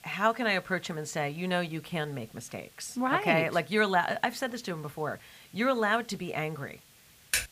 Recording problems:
hiss; faint; throughout; 25 dB below the speech
keyboard typing; noticeable; at 7.5 s; peak 1 dB below the speech

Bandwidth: 15 kHz